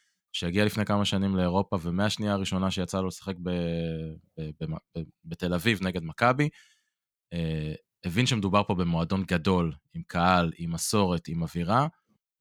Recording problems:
none

